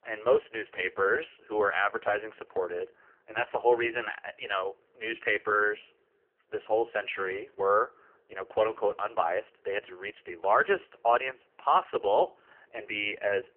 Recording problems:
phone-call audio; poor line; nothing above 3 kHz

